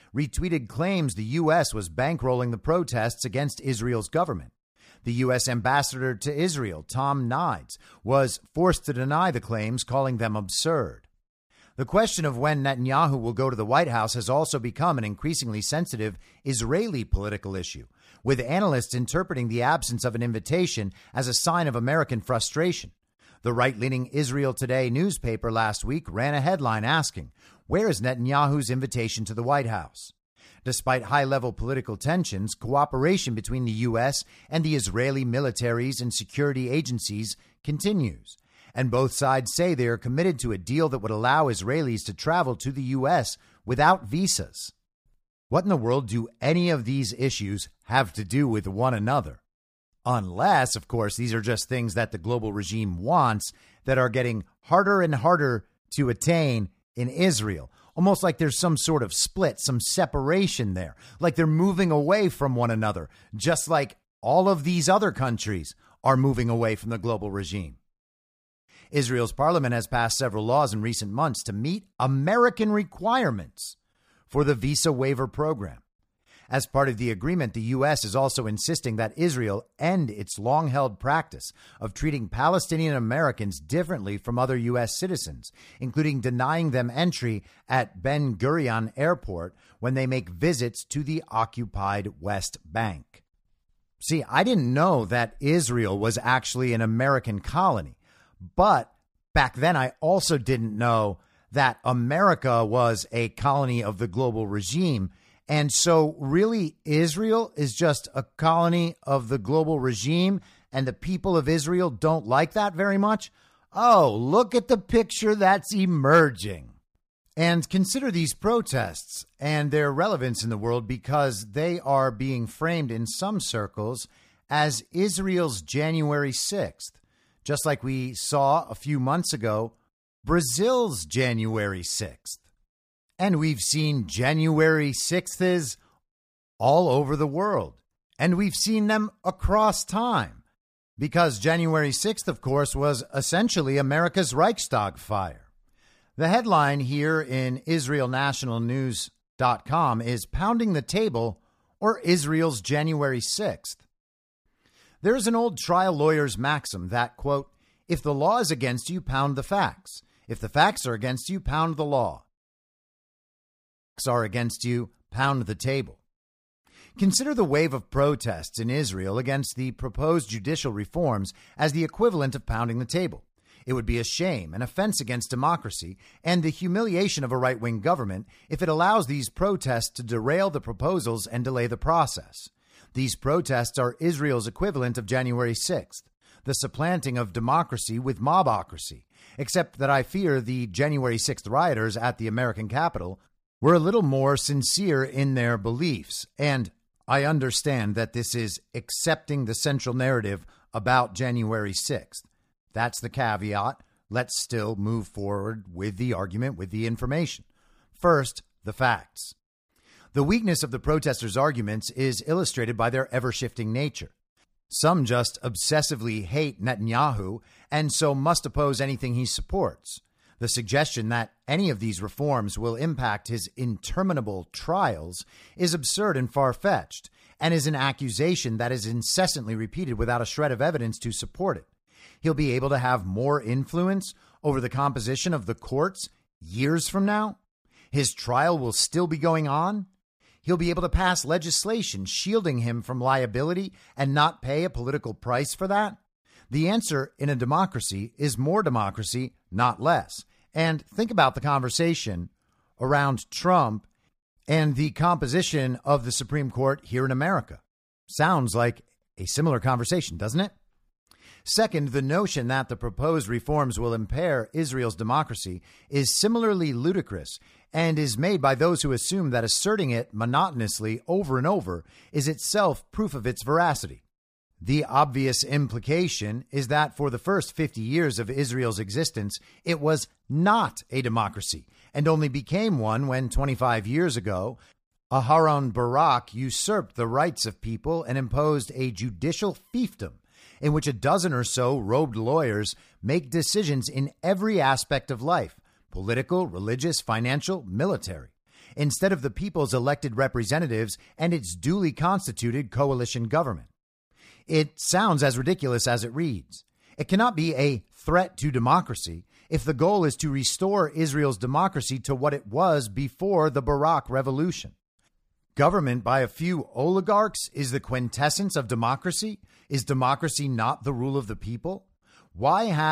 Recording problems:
audio cutting out; at 2:42 for 1.5 s
abrupt cut into speech; at the end

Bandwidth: 15 kHz